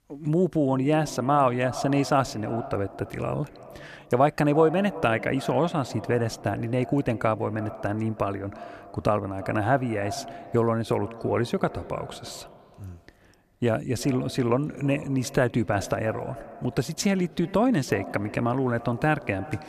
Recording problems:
echo of what is said; noticeable; throughout; 330 ms later, 15 dB below the speech

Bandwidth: 14 kHz